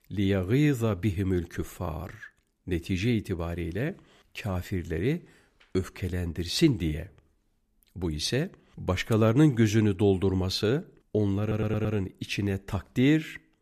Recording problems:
audio stuttering; at 11 s

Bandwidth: 14.5 kHz